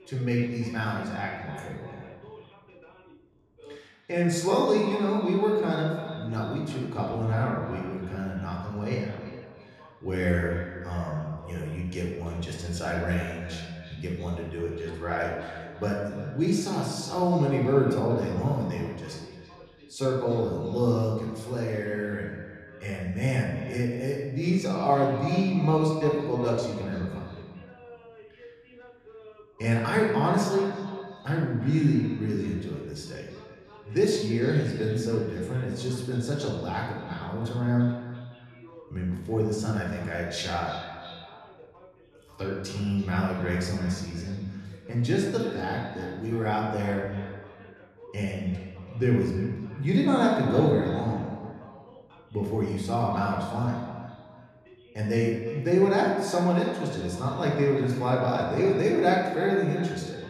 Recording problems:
echo of what is said; noticeable; throughout; 340 ms later, 15 dB below the speech
room echo; noticeable; dies away in 1 s
off-mic speech; somewhat distant
voice in the background; faint; throughout; 25 dB below the speech

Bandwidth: 13.5 kHz